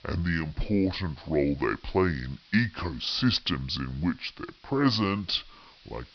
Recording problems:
wrong speed and pitch; too slow and too low; 0.7 times normal speed
high frequencies cut off; noticeable; nothing above 5.5 kHz
hiss; faint; throughout; 25 dB below the speech

